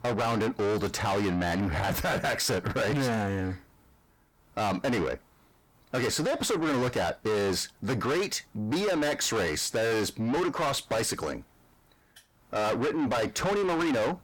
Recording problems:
distortion; heavy; 6 dB below the speech

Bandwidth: 18 kHz